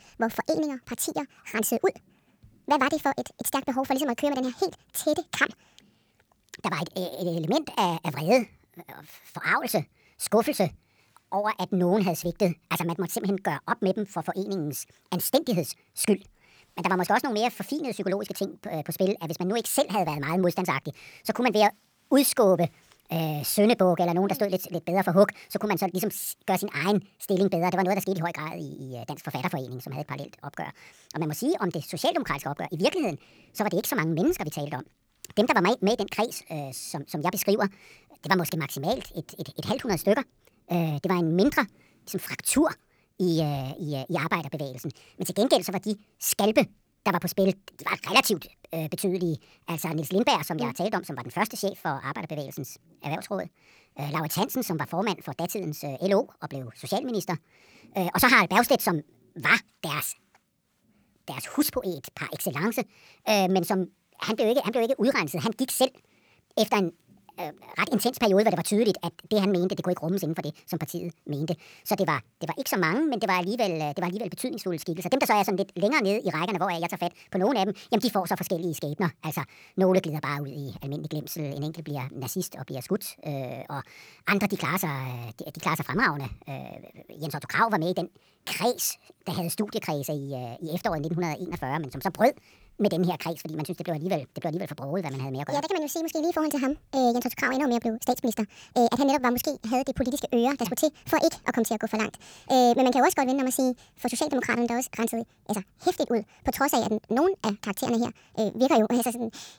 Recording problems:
wrong speed and pitch; too fast and too high; 1.5 times normal speed

